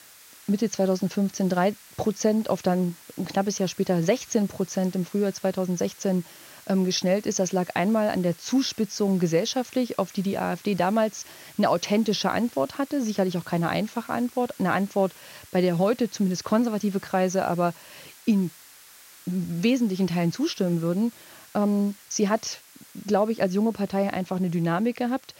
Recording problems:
high frequencies cut off; noticeable; nothing above 7 kHz
hiss; faint; throughout; 20 dB below the speech

